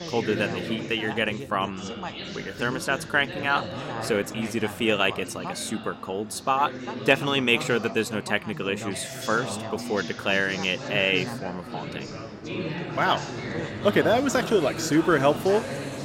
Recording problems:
background chatter; loud; throughout; 4 voices, 9 dB below the speech
train or aircraft noise; faint; throughout; 20 dB below the speech

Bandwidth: 16 kHz